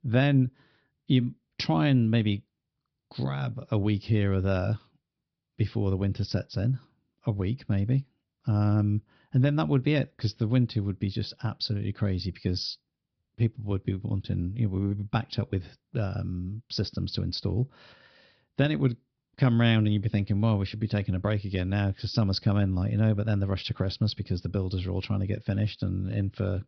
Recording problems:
high frequencies cut off; noticeable; nothing above 5.5 kHz

